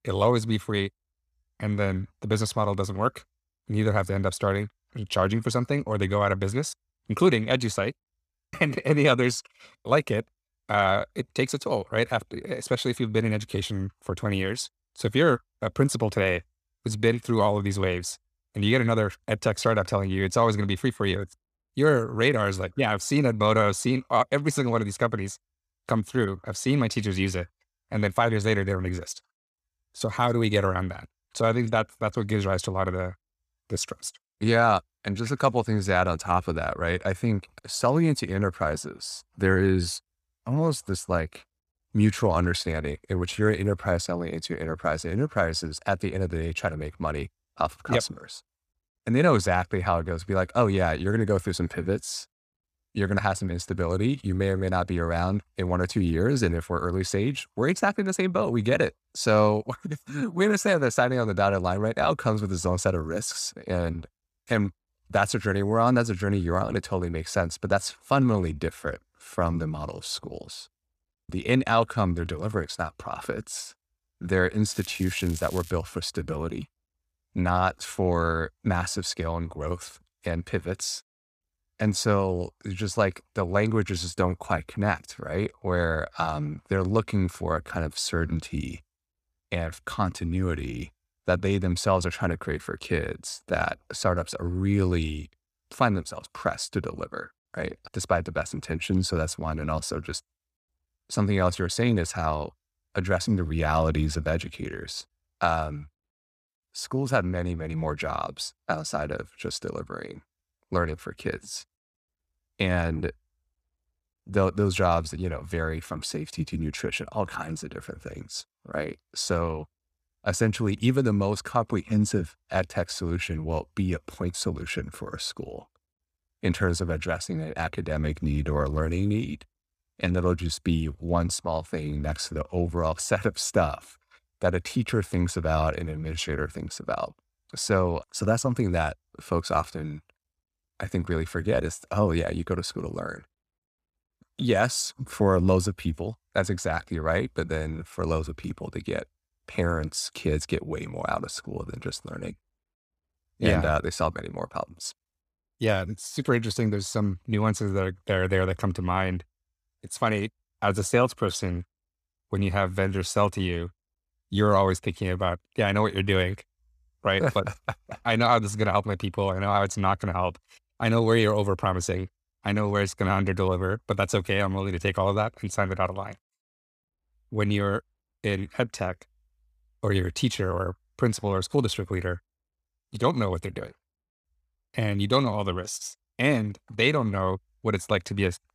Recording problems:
crackling; noticeable; at 1:15; 15 dB below the speech

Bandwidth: 14.5 kHz